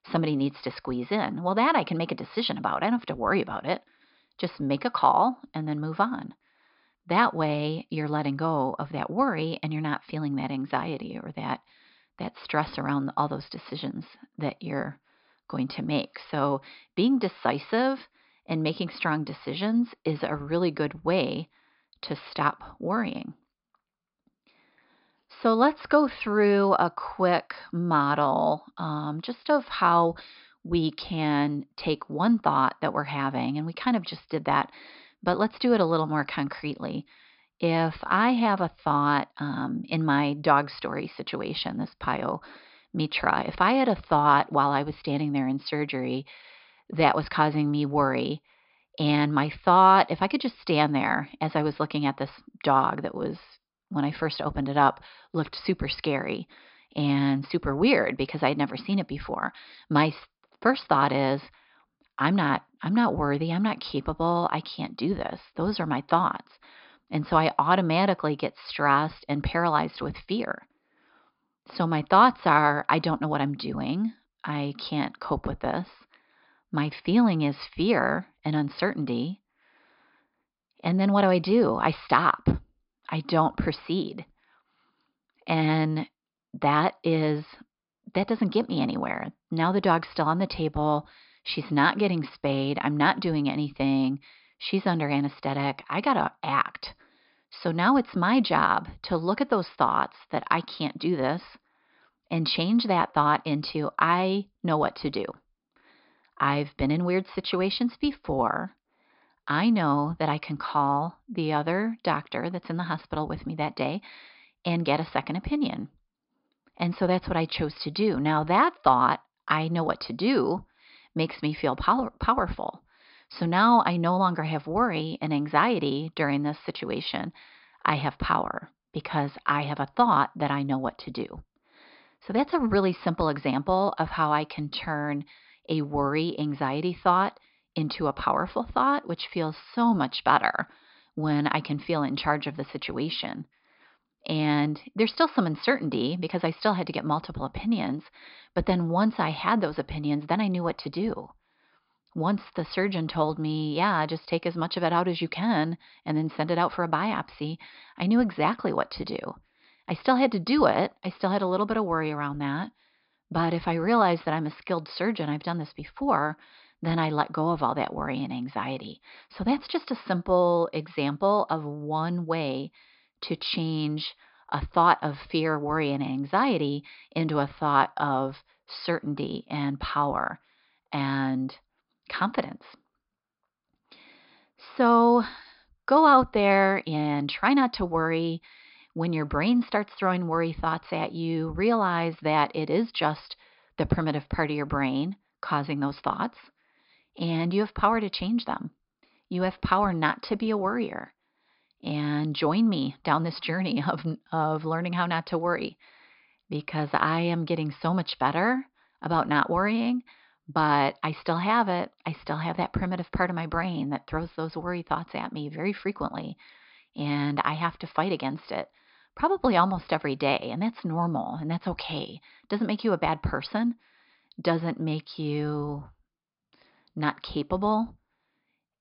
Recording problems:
high frequencies cut off; noticeable; nothing above 5.5 kHz

